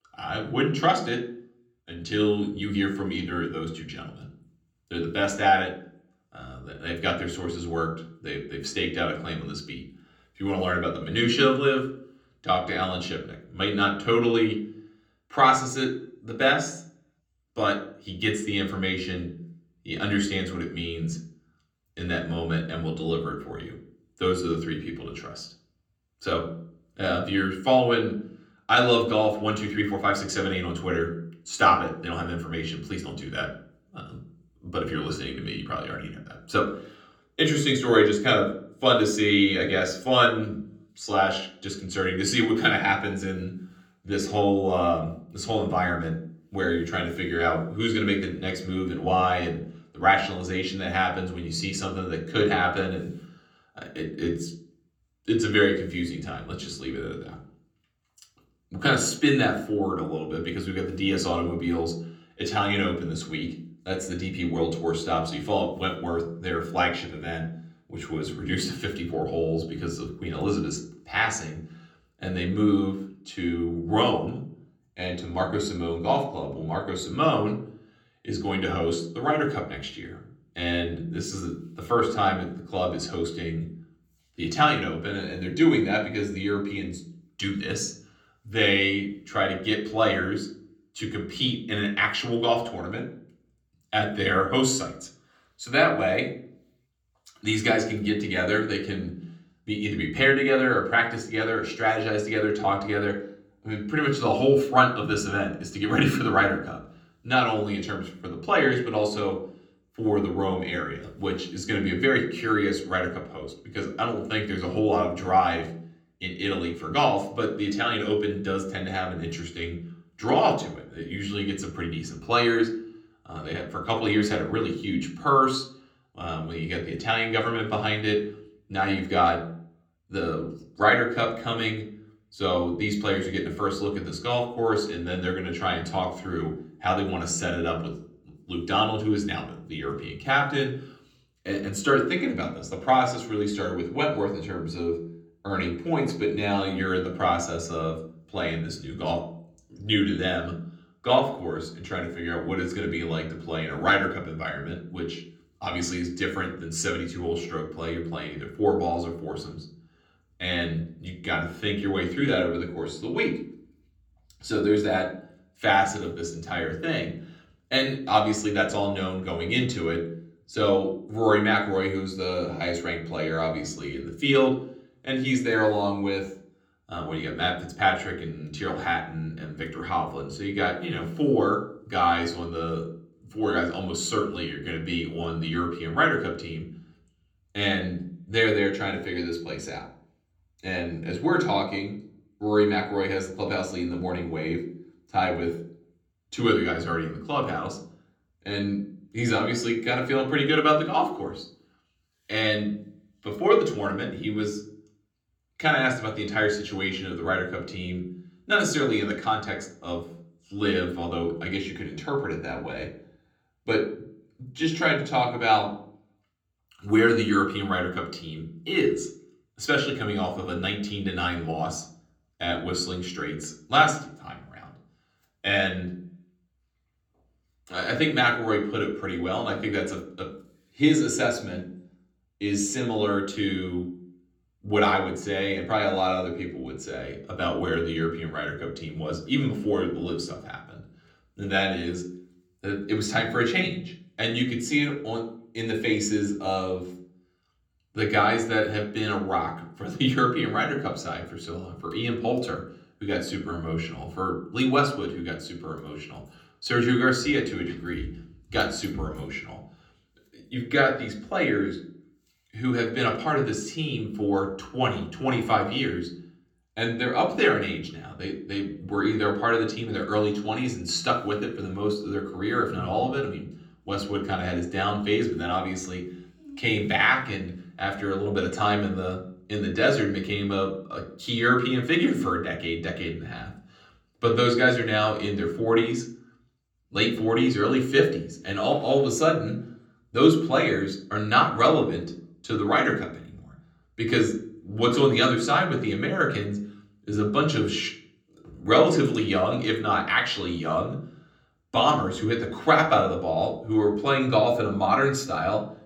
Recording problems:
off-mic speech; far
room echo; slight; dies away in 0.6 s

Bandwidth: 18 kHz